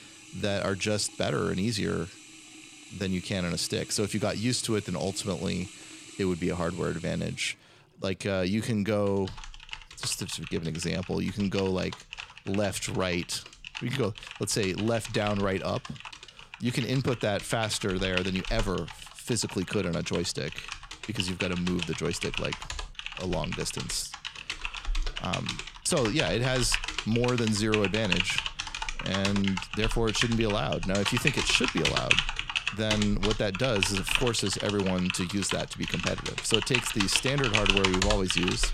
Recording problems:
household noises; loud; throughout; 3 dB below the speech

